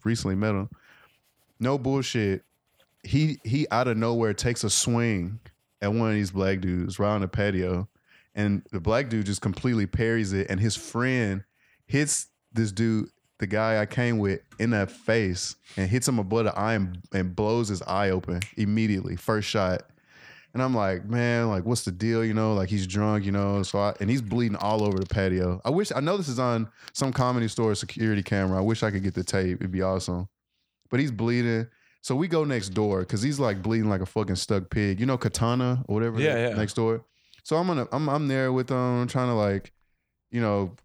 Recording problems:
household noises; faint; throughout; 30 dB below the speech

